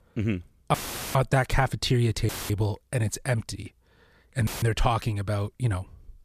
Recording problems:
audio cutting out; filled with static; at 0.5 s, at 2.5 s and at 4.5 s

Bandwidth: 14.5 kHz